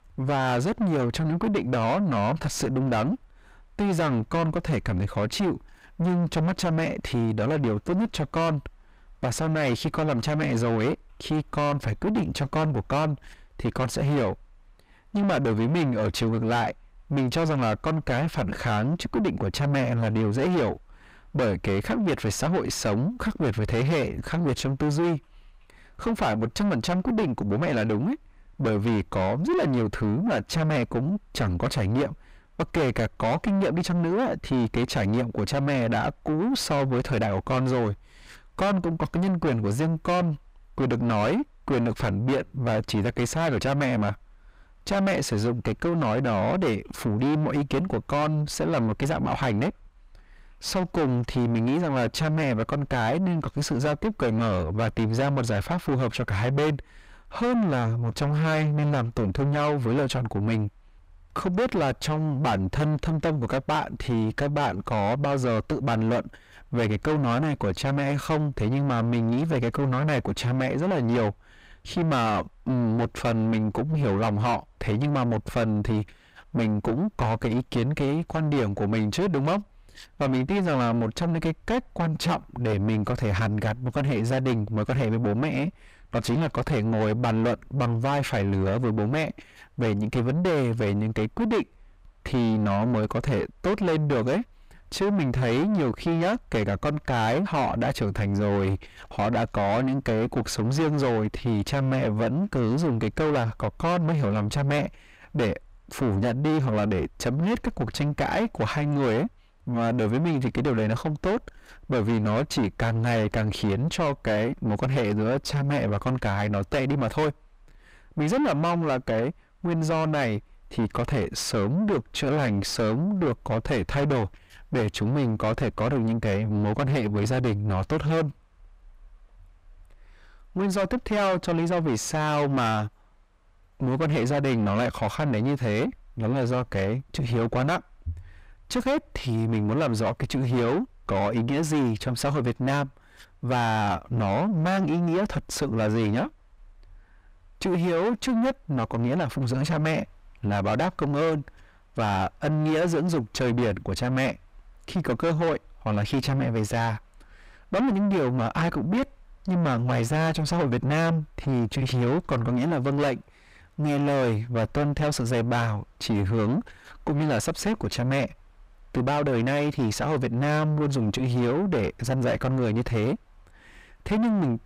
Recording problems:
distortion; heavy; 4 dB below the speech

